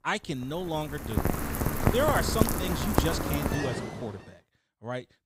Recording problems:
rain or running water; very loud; until 4 s; 3 dB above the speech

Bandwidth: 15.5 kHz